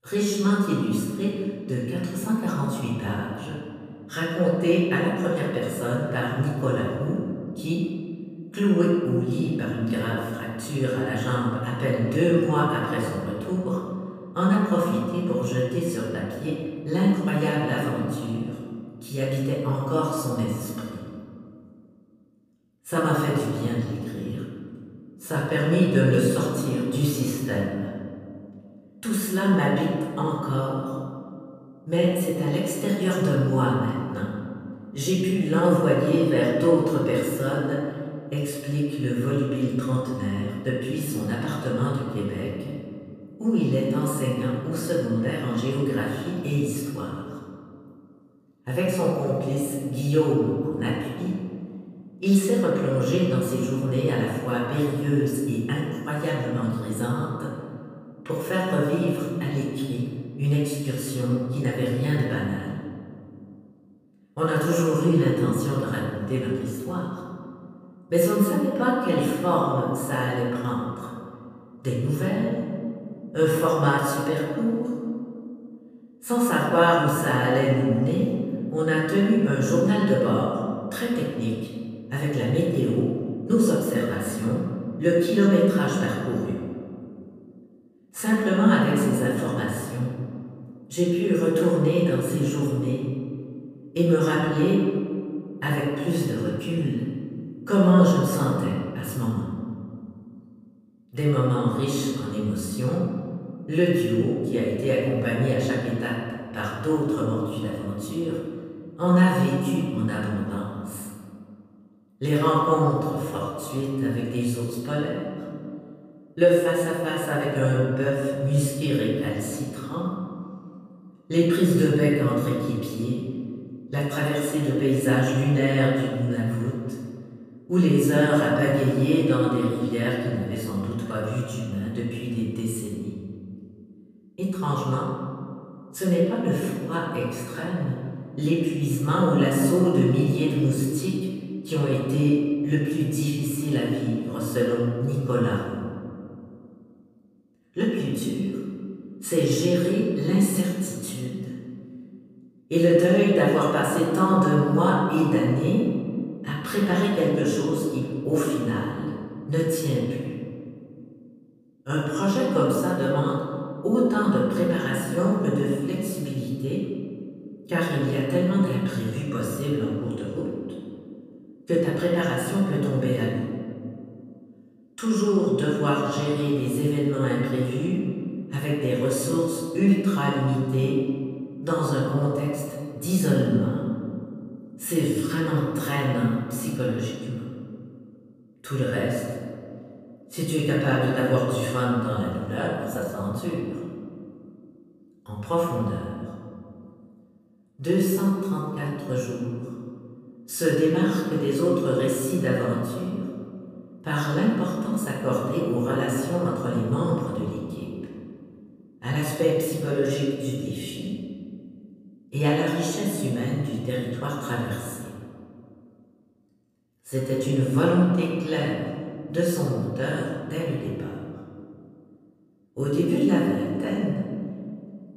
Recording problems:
off-mic speech; far
room echo; noticeable; dies away in 2 s

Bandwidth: 15 kHz